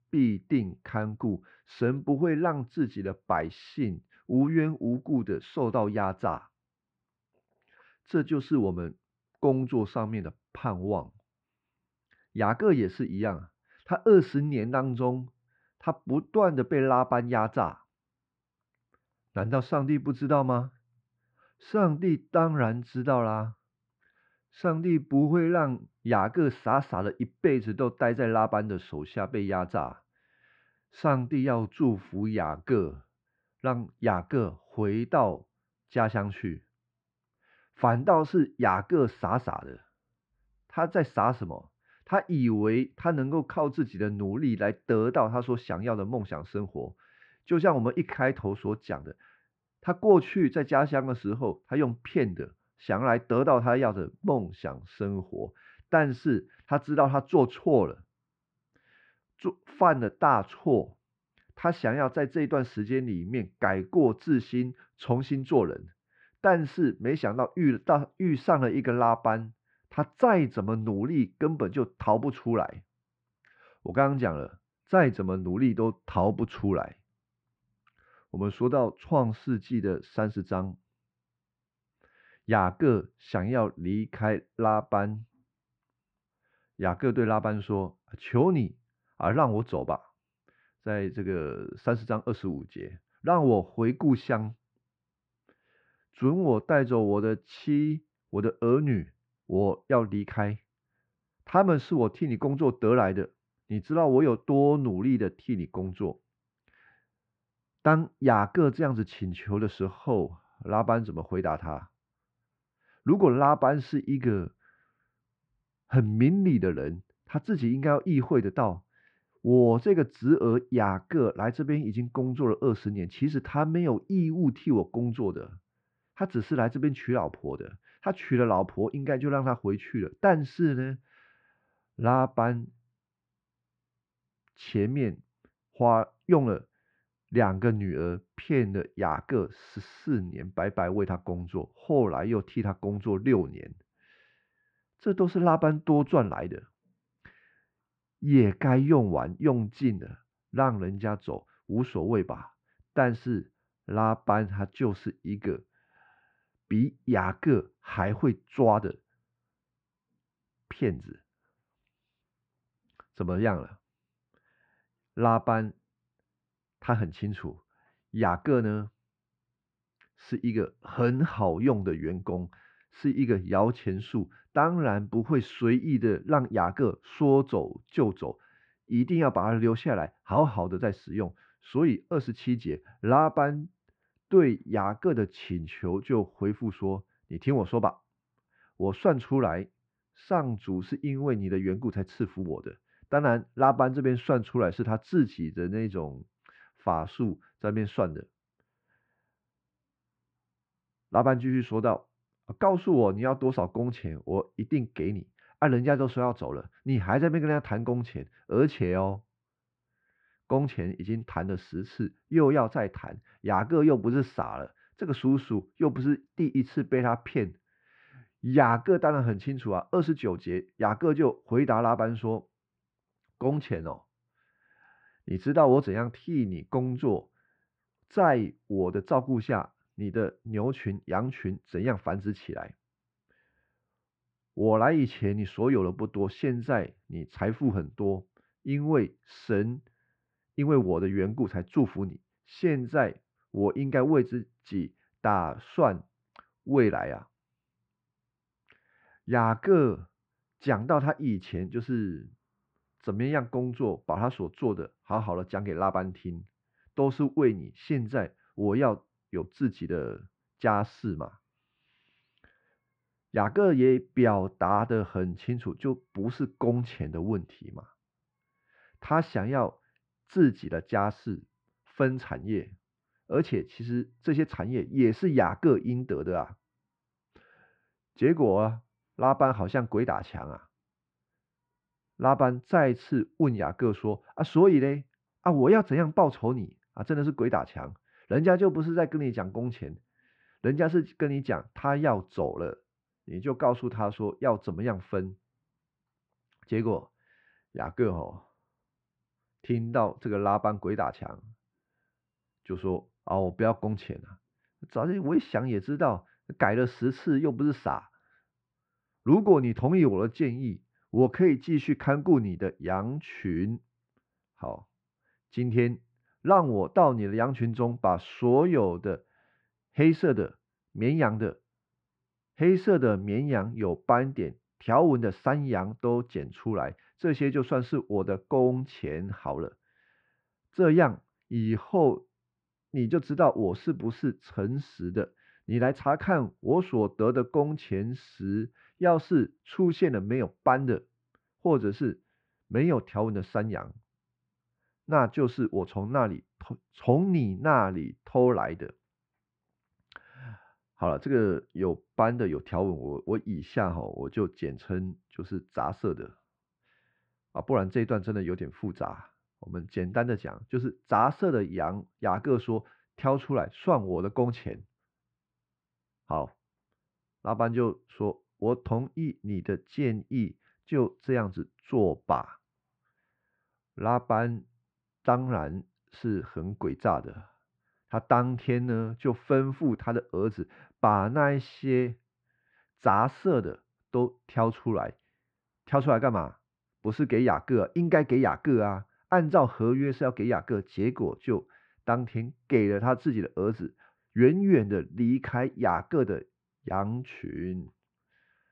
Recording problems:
muffled; very; fading above 2 kHz

